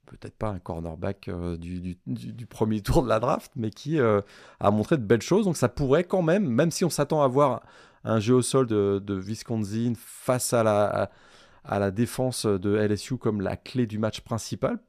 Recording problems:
none

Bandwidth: 14.5 kHz